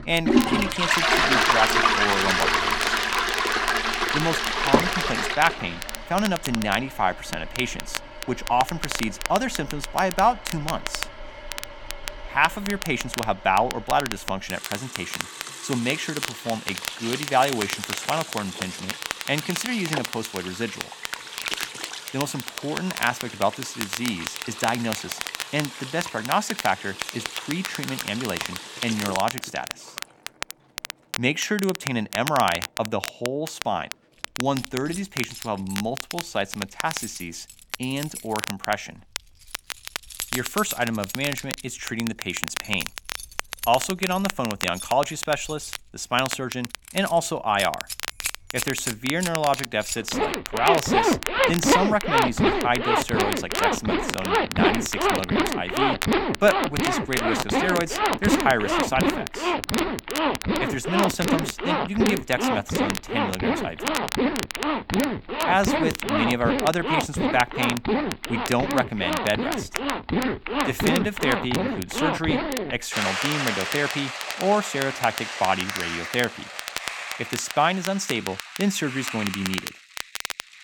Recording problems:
household noises; very loud; throughout; as loud as the speech
crackle, like an old record; loud; 7 dB below the speech

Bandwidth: 17.5 kHz